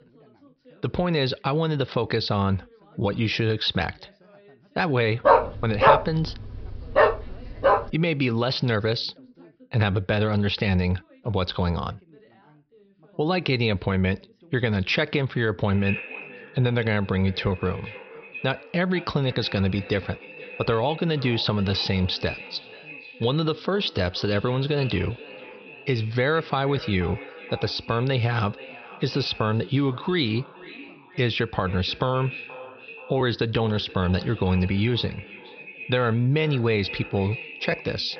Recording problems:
echo of what is said; noticeable; from 16 s on; 480 ms later, 15 dB below the speech
high frequencies cut off; noticeable; nothing above 5.5 kHz
background chatter; faint; throughout; 2 voices, 30 dB below the speech
dog barking; loud; from 5.5 to 8 s; peak 6 dB above the speech

